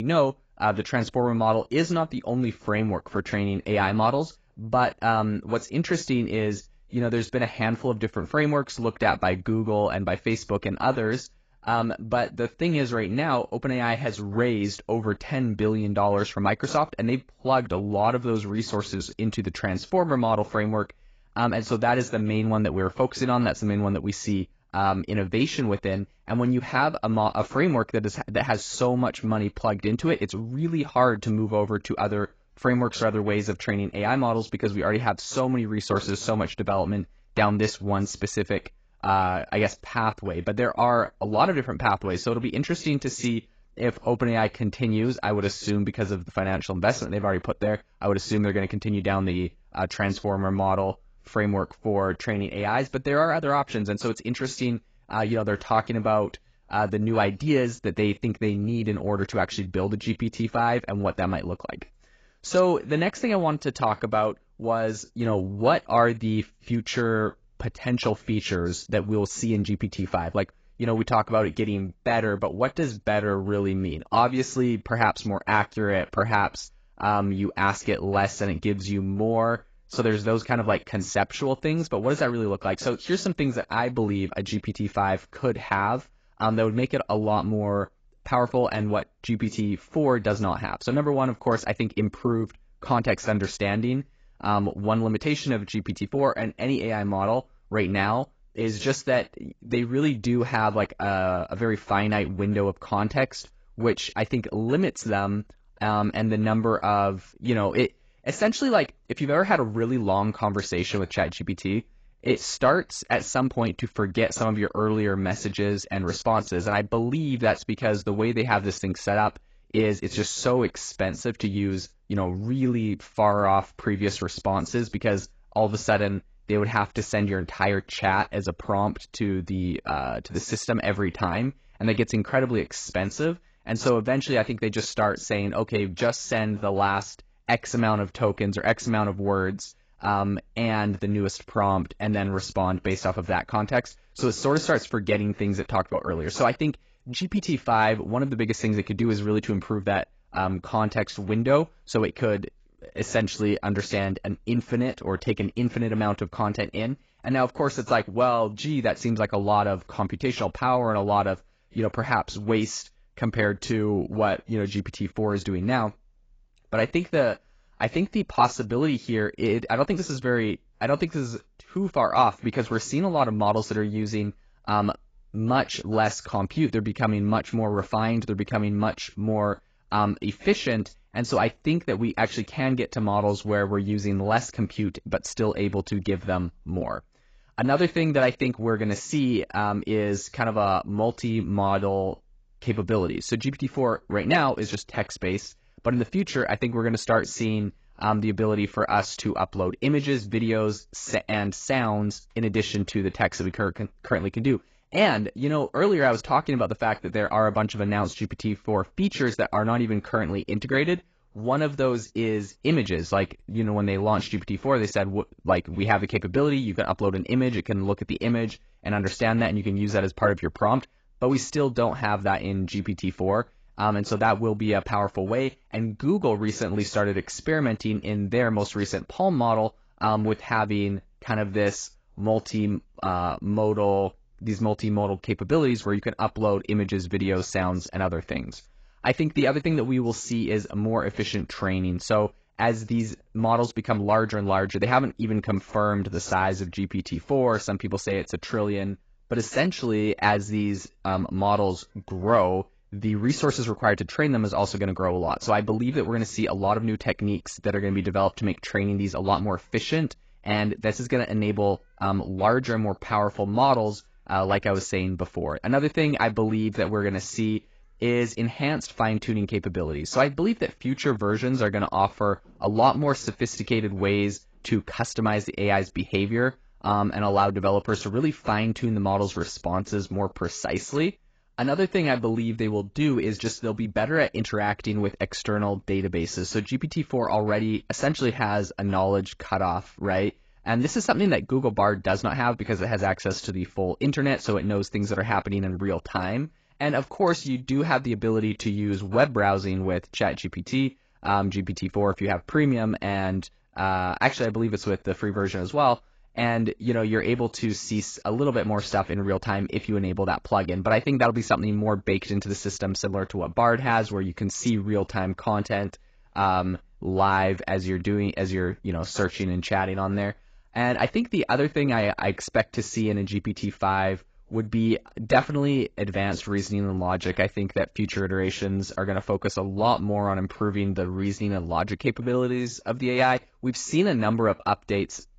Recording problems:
garbled, watery; badly; nothing above 7.5 kHz
abrupt cut into speech; at the start

